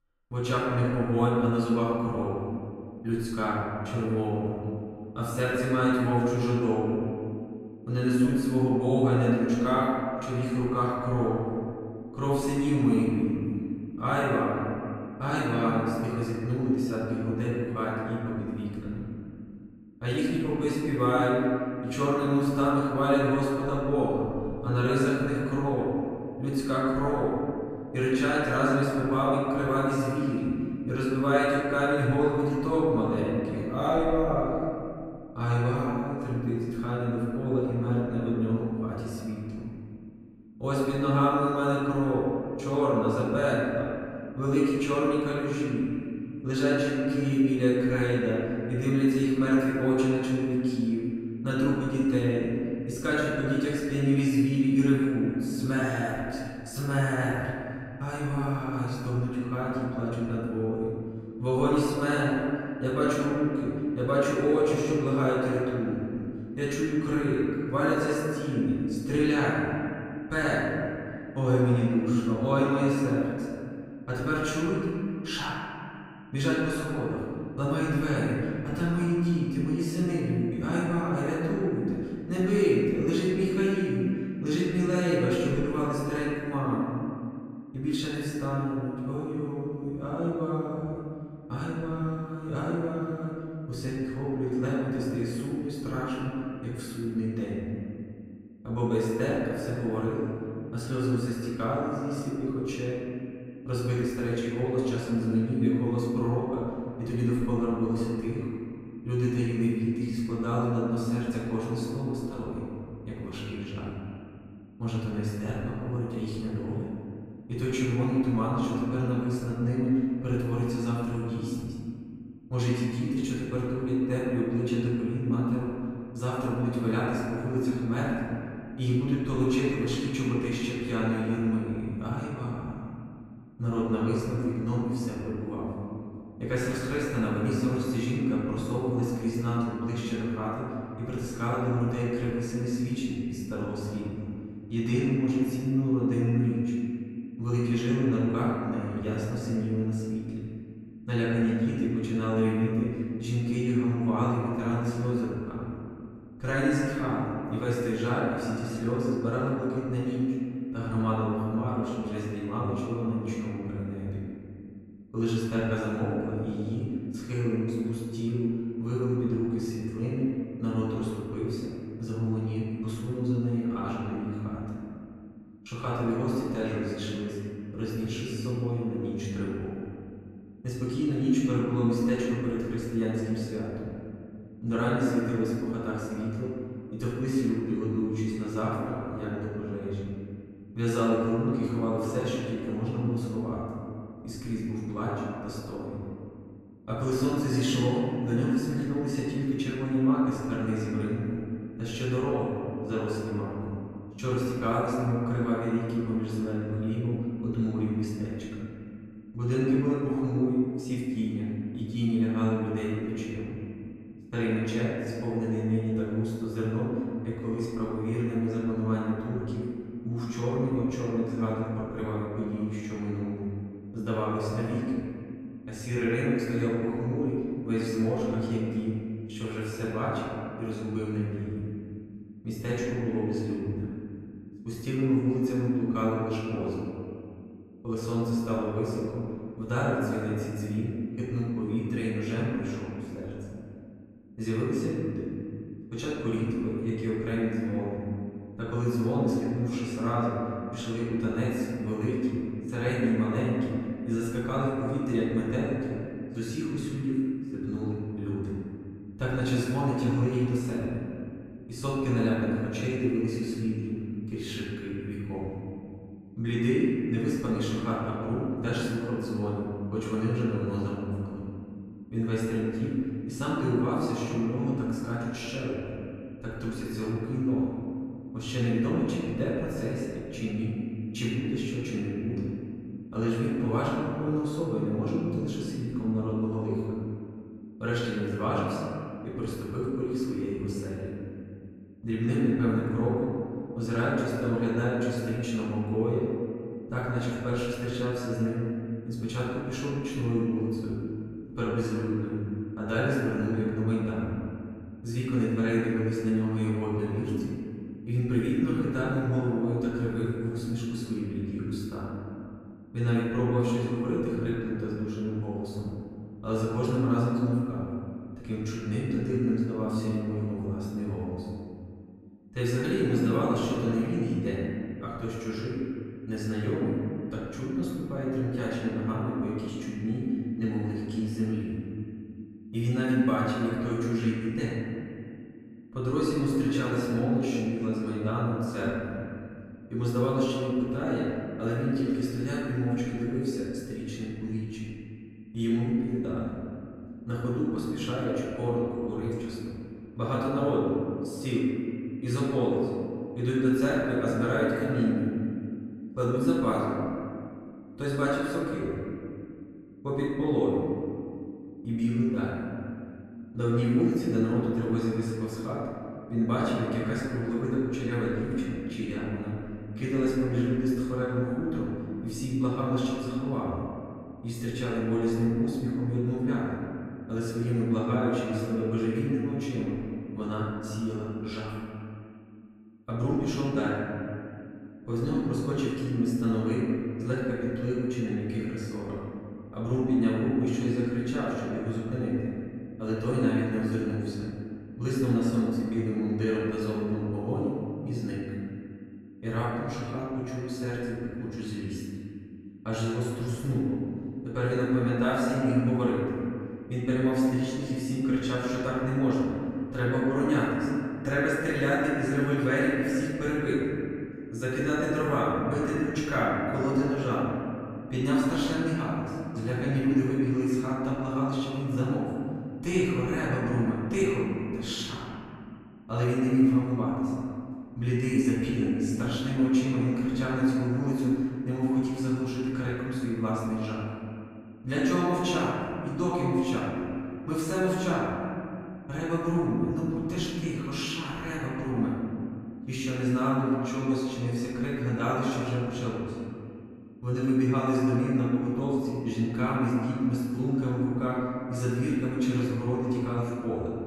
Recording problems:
room echo; strong; dies away in 2.4 s
off-mic speech; far

